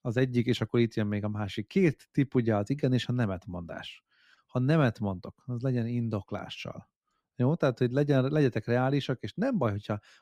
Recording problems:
none

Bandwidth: 15.5 kHz